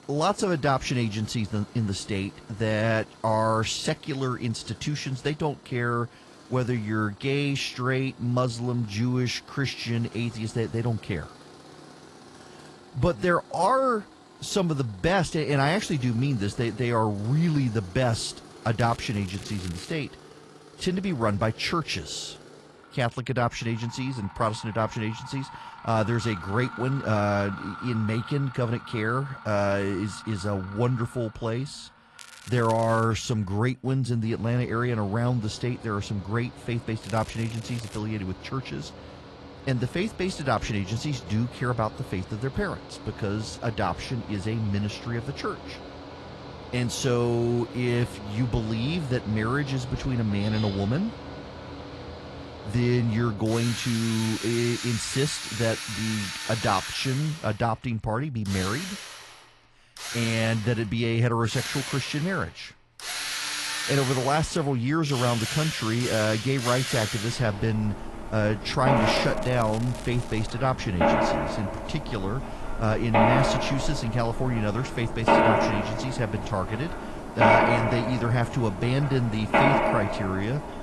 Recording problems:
garbled, watery; slightly
machinery noise; loud; throughout; 4 dB below the speech
crackling; noticeable; 4 times, first at 19 s; 20 dB below the speech

